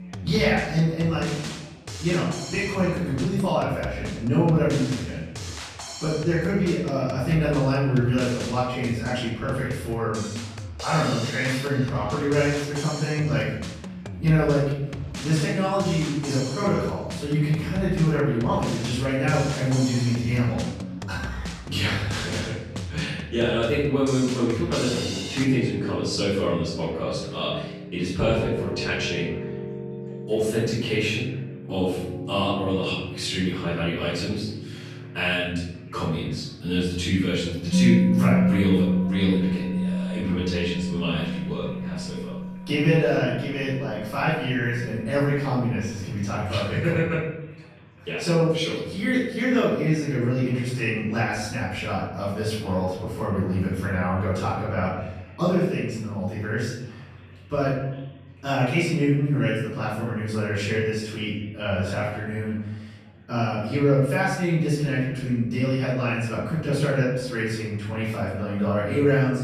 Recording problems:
off-mic speech; far
room echo; noticeable; dies away in 0.9 s
background music; loud; throughout; 7 dB below the speech
chatter from many people; faint; throughout; 25 dB below the speech

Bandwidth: 14 kHz